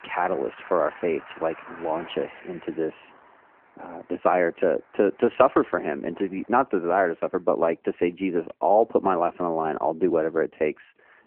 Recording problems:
phone-call audio
traffic noise; faint; throughout; 20 dB below the speech

